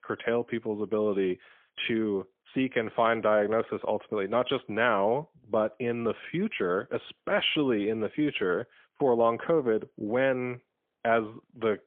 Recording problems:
phone-call audio; poor line; nothing above 3.5 kHz

